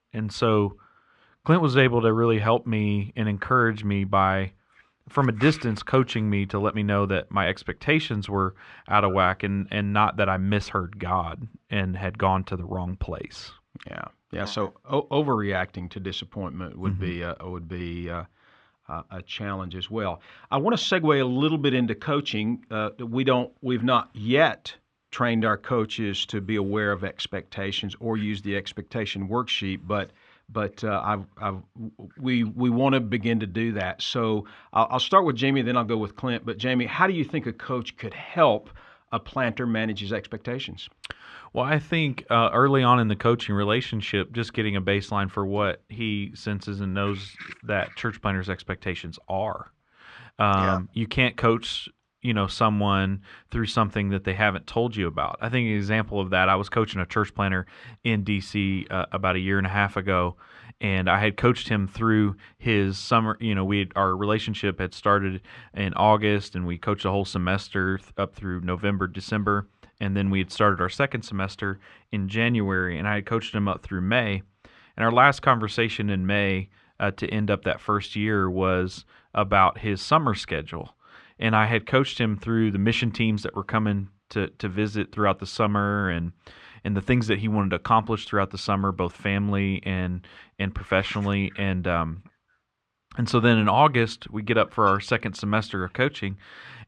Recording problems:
muffled; slightly; fading above 2.5 kHz

